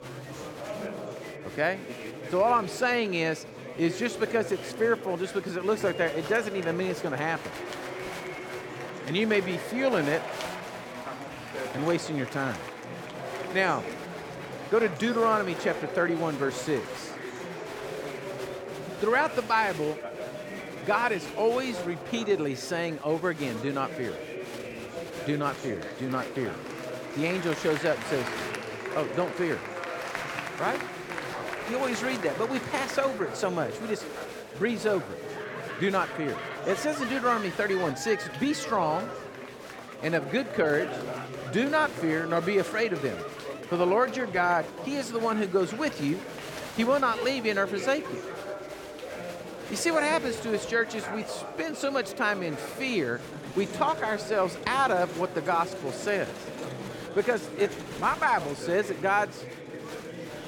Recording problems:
chatter from many people; loud; throughout; 8 dB below the speech

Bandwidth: 17 kHz